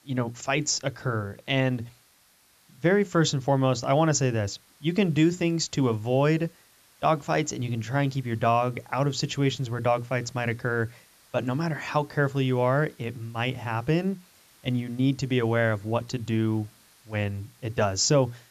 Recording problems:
high frequencies cut off; noticeable; nothing above 8 kHz
hiss; faint; throughout; 30 dB below the speech

